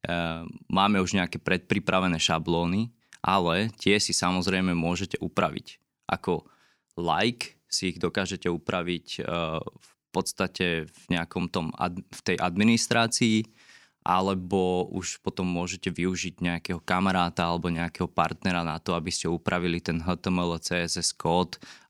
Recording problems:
none

